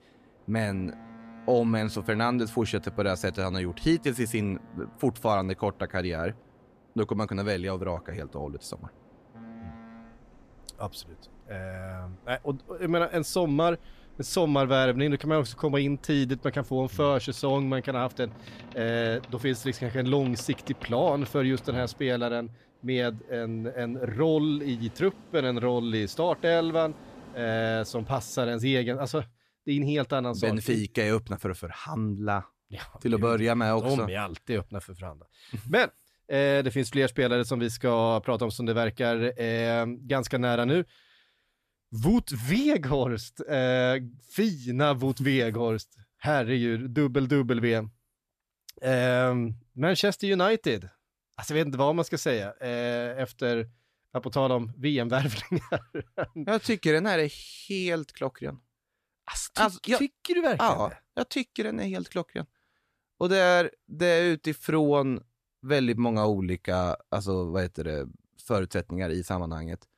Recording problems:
train or aircraft noise; faint; until 28 s; 25 dB below the speech

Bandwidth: 14.5 kHz